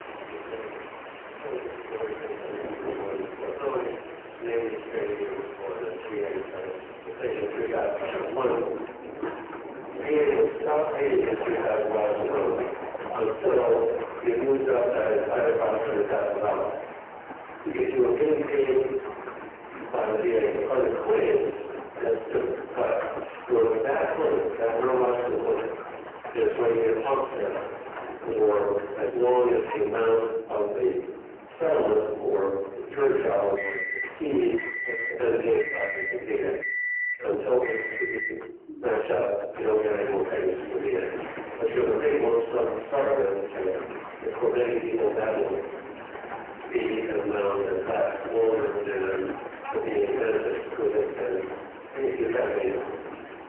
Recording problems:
phone-call audio; poor line
distortion; heavy; 5 dB below the speech
off-mic speech; far
room echo; noticeable; dies away in 0.8 s
household noises; loud; throughout; 9 dB below the speech
rain or running water; noticeable; until 16 s; 10 dB below the speech

